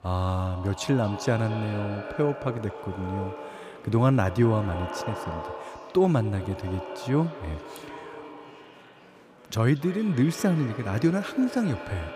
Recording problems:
echo of what is said; strong; throughout; 230 ms later, 10 dB below the speech
murmuring crowd; faint; throughout; 25 dB below the speech

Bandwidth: 15 kHz